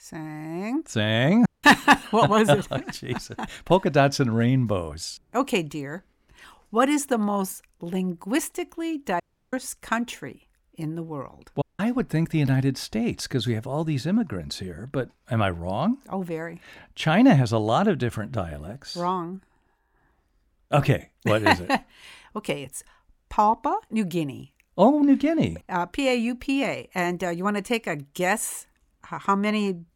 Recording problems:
audio cutting out; at 1.5 s, at 9 s and at 12 s

